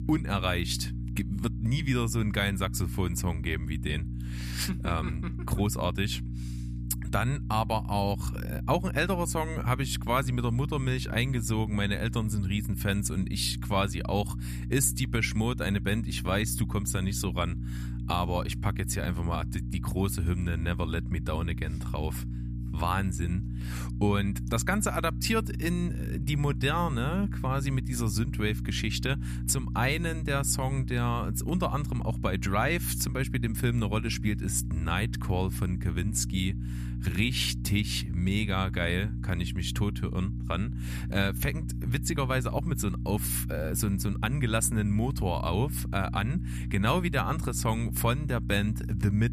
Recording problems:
electrical hum; noticeable; throughout; 60 Hz, 15 dB below the speech

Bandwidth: 14.5 kHz